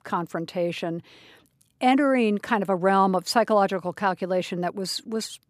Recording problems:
none

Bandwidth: 14.5 kHz